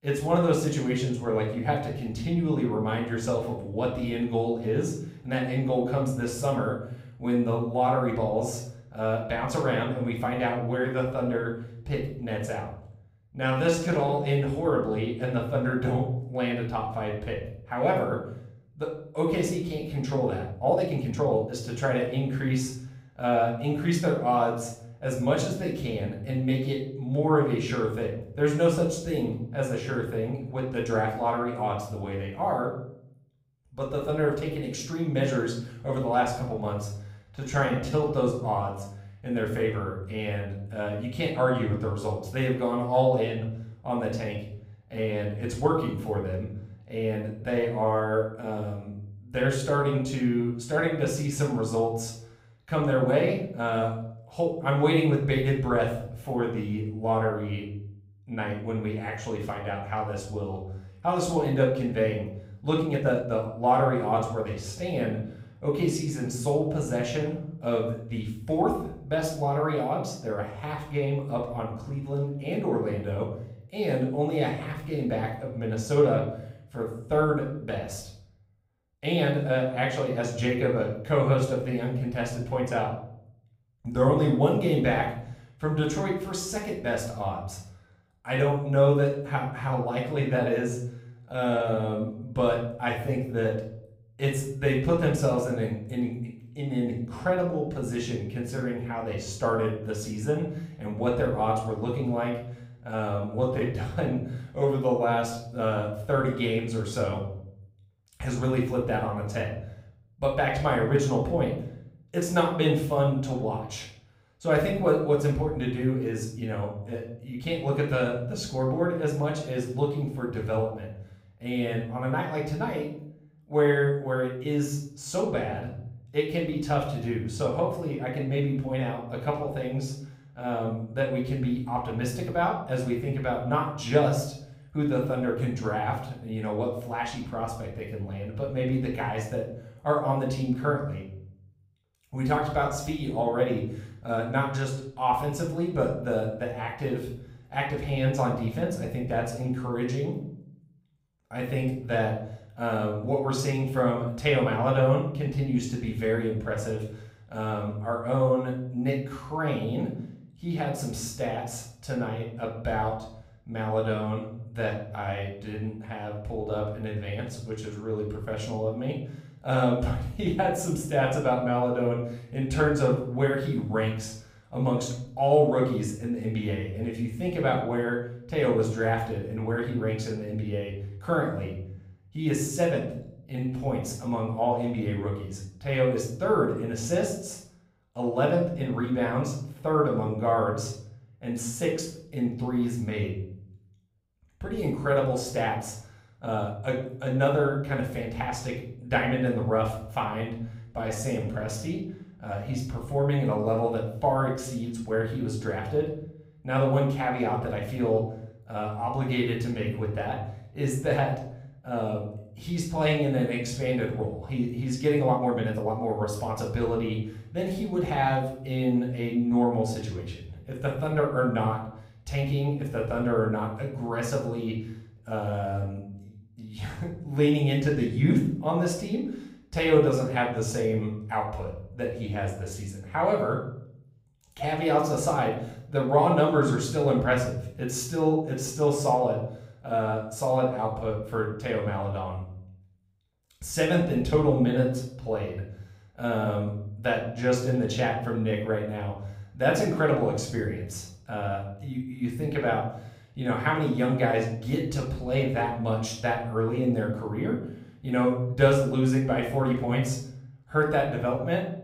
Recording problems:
room echo; noticeable; dies away in 0.6 s
off-mic speech; somewhat distant
uneven, jittery; strongly; from 13 s to 3:36

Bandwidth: 15.5 kHz